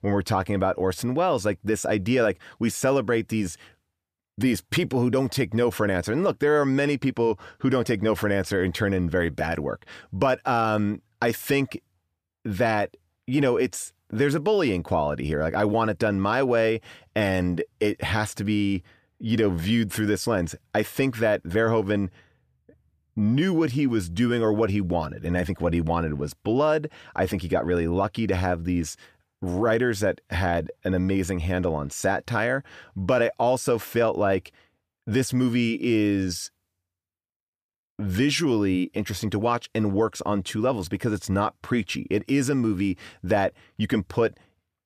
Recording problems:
none

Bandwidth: 15 kHz